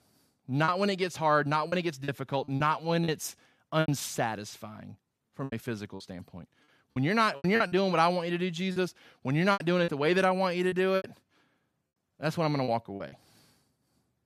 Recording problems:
choppy; very; 11% of the speech affected

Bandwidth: 14.5 kHz